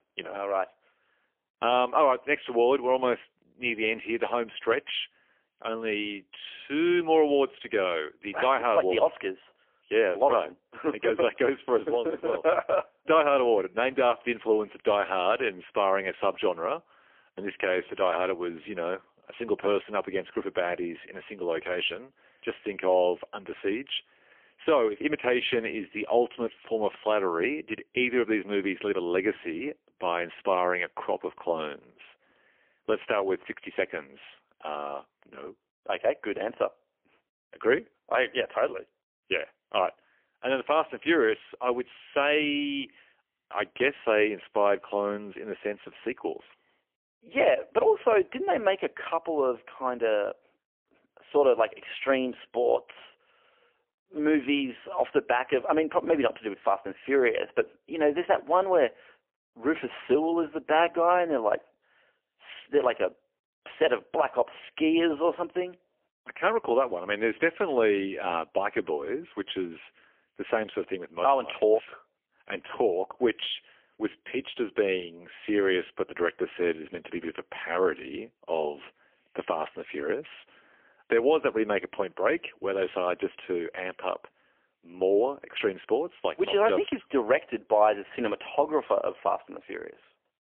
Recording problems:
phone-call audio; poor line; nothing above 3.5 kHz

